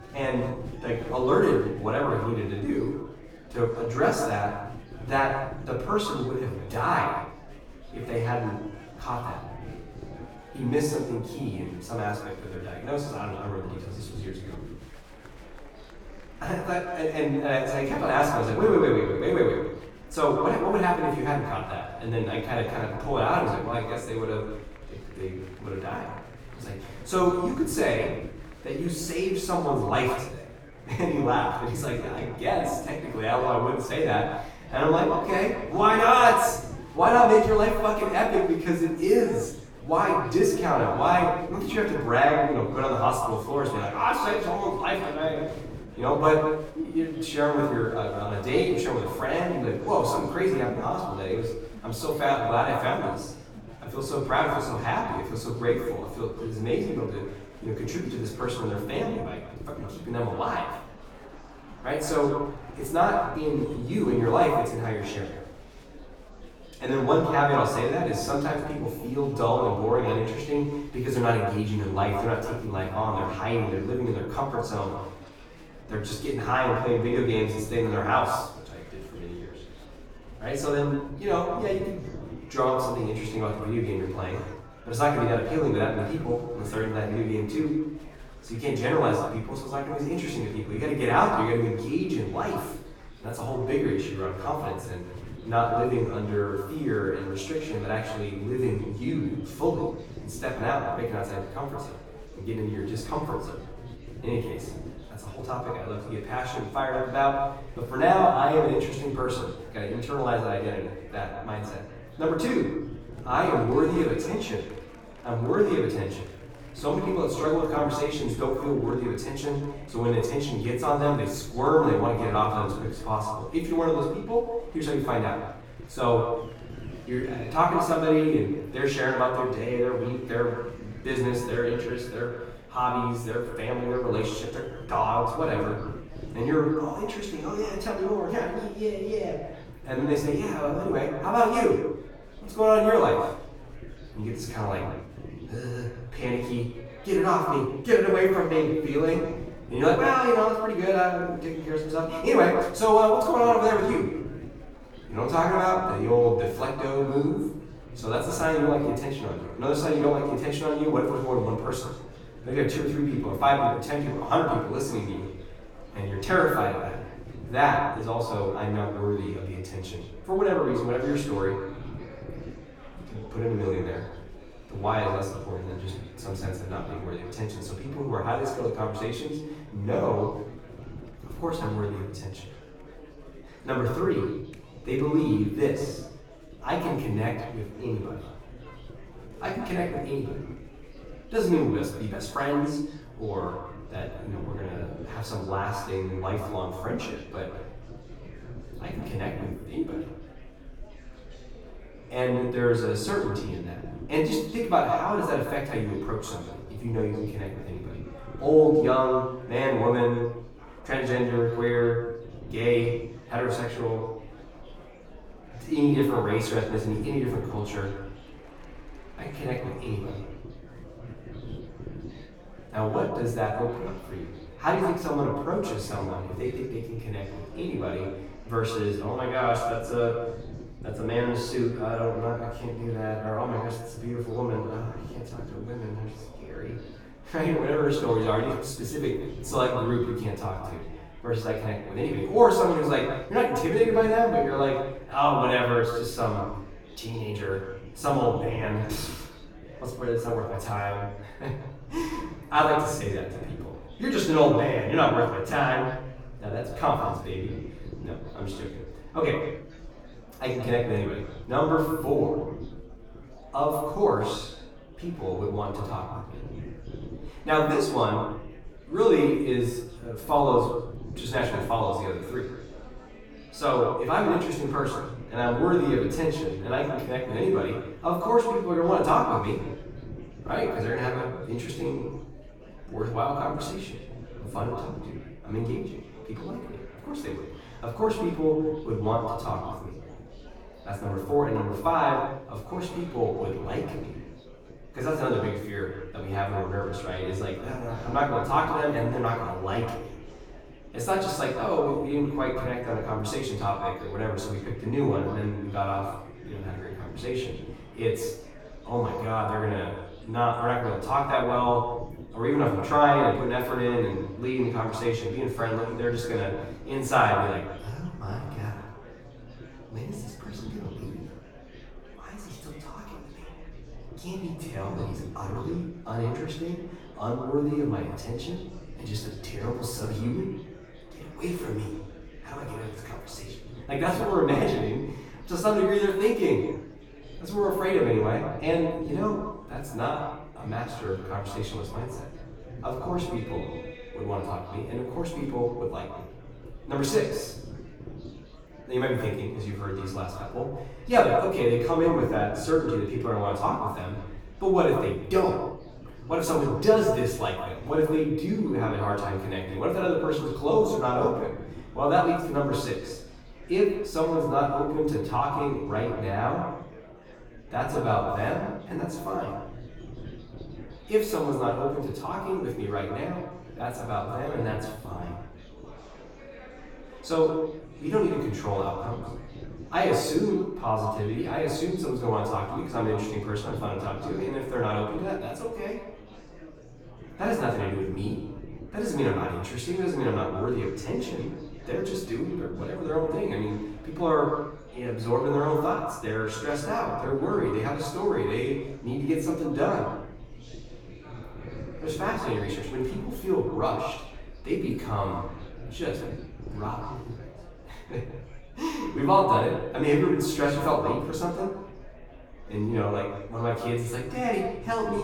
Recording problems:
echo of what is said; strong; throughout; 160 ms later, 7 dB below the speech
off-mic speech; far
room echo; noticeable; dies away in 0.5 s
murmuring crowd; faint; throughout; 20 dB below the speech
low rumble; faint; throughout; 25 dB below the speech
abrupt cut into speech; at the end

